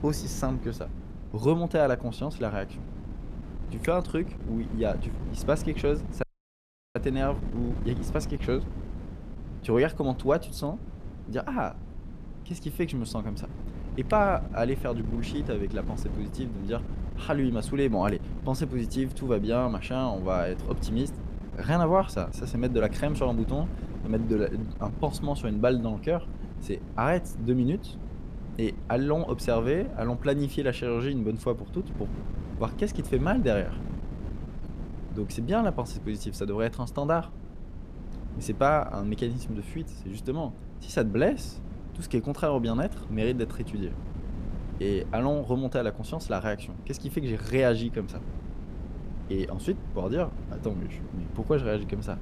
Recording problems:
wind noise on the microphone; occasional gusts; 15 dB below the speech
audio cutting out; at 6 s for 0.5 s

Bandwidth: 14.5 kHz